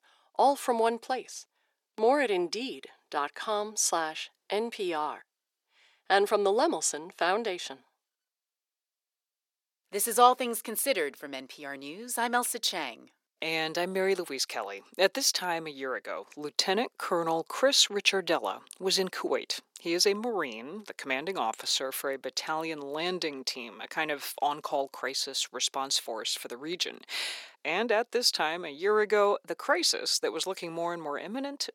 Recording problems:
thin; somewhat; fading below 350 Hz

